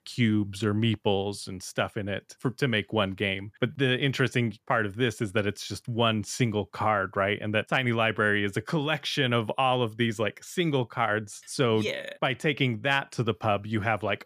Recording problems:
none

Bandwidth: 15 kHz